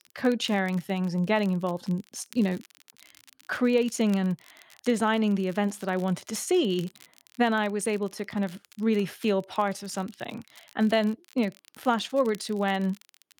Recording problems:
crackle, like an old record; faint; 25 dB below the speech

